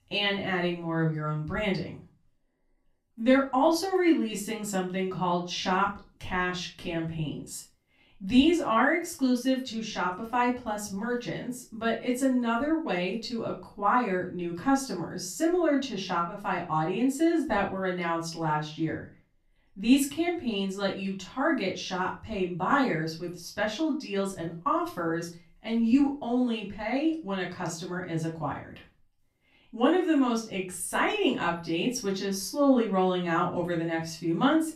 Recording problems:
off-mic speech; far
room echo; slight; dies away in 0.3 s

